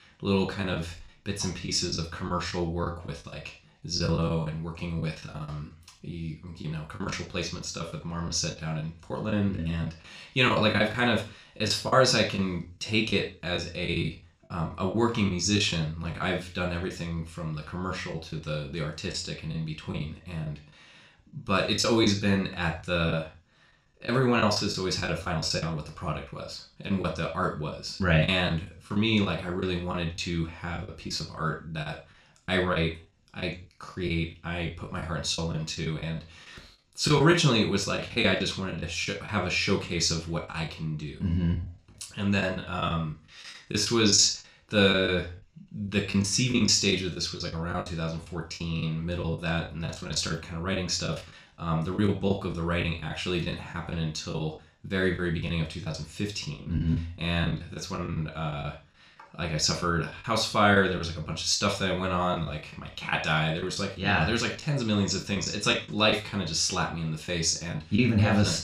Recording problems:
room echo; slight; dies away in 0.3 s
off-mic speech; somewhat distant
choppy; very; 9% of the speech affected

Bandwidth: 15 kHz